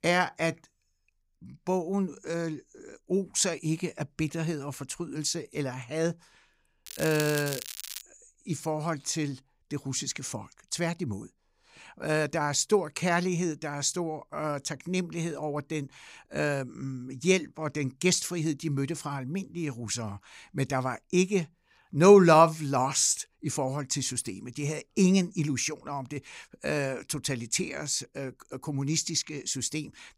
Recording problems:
crackling; loud; from 7 to 8 s; 9 dB below the speech

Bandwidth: 15.5 kHz